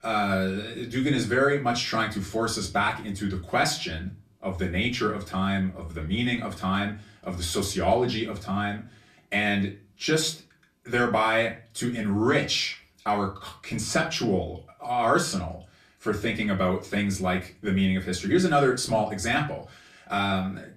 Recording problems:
off-mic speech; far
room echo; very slight; dies away in 0.3 s

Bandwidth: 14.5 kHz